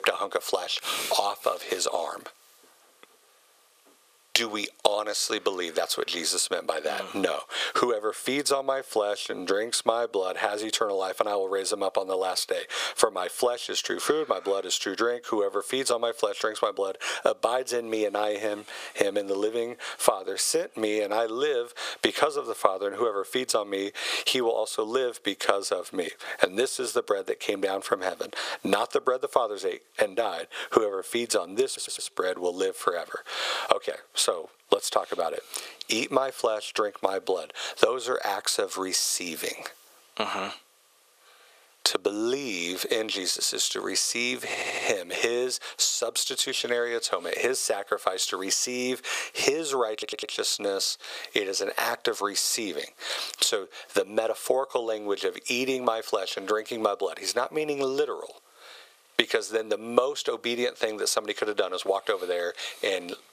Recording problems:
thin; very; fading below 450 Hz
squashed, flat; somewhat
audio stuttering; at 32 s, at 44 s and at 50 s

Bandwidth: 15 kHz